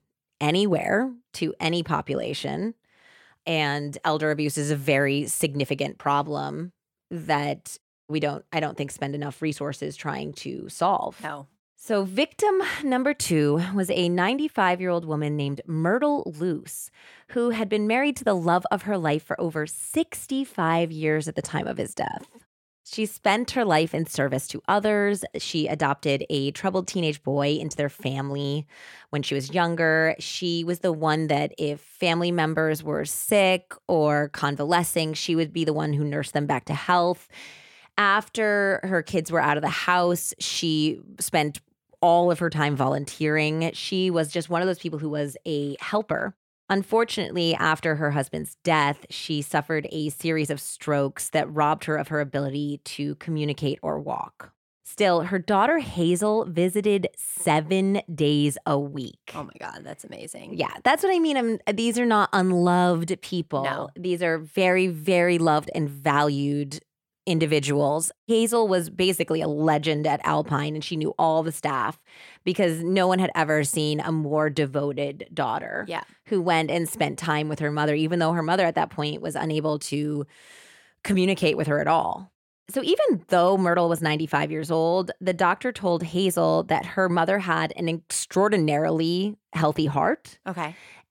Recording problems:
none

